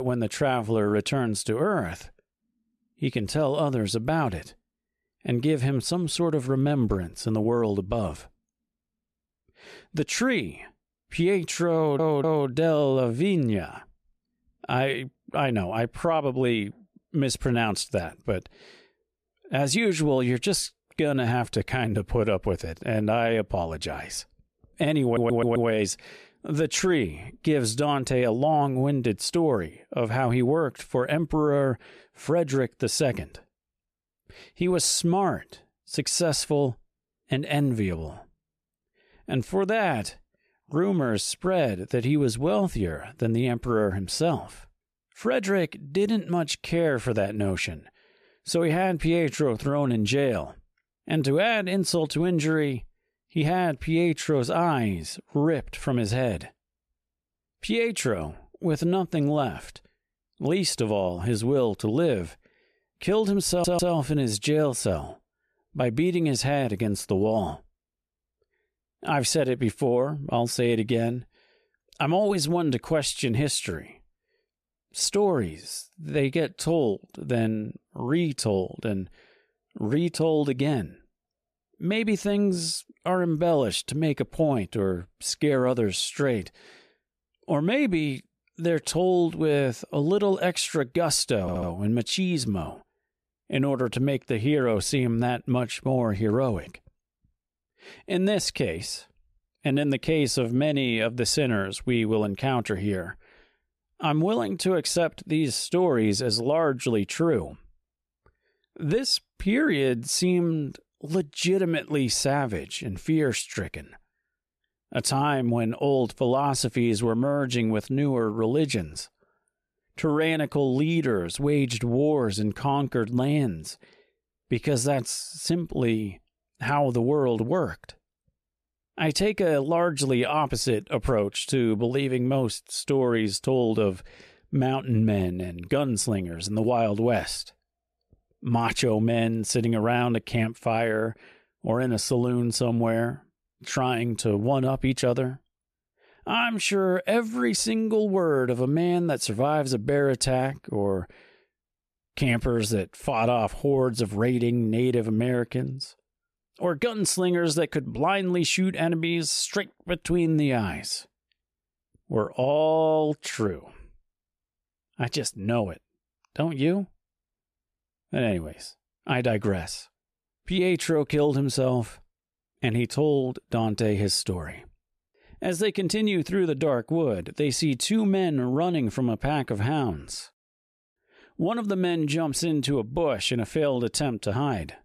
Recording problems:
abrupt cut into speech; at the start
audio stuttering; 4 times, first at 12 s

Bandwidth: 14.5 kHz